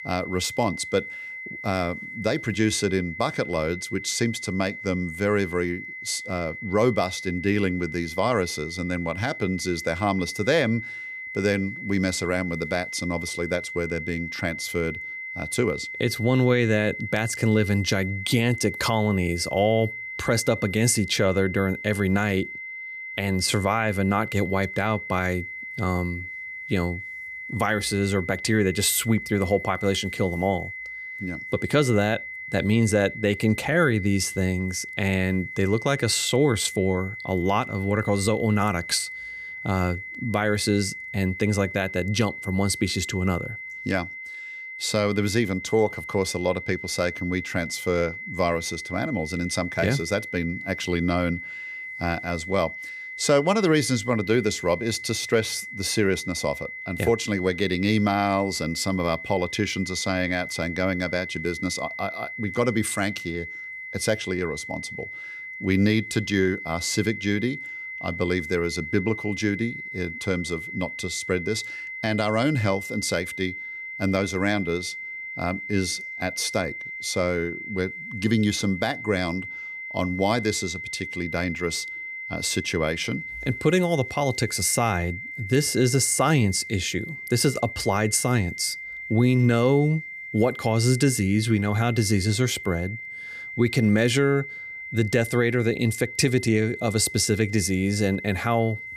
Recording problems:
high-pitched whine; loud; throughout; 2 kHz, 9 dB below the speech

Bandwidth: 15 kHz